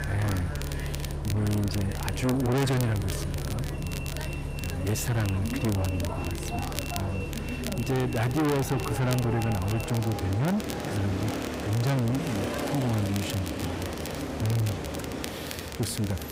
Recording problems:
distortion; heavy; 6 dB below the speech
echo of what is said; noticeable; from 6 s on; 380 ms later, 15 dB below the speech
traffic noise; loud; throughout; 5 dB below the speech
murmuring crowd; noticeable; throughout; 15 dB below the speech
crackle, like an old record; noticeable; 10 dB below the speech

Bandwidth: 15.5 kHz